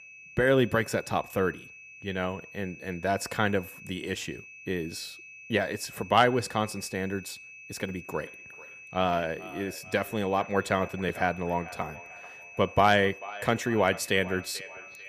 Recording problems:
echo of what is said; noticeable; from 8 s on; 440 ms later, 15 dB below the speech
high-pitched whine; noticeable; throughout; 2.5 kHz, 15 dB below the speech

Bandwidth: 15 kHz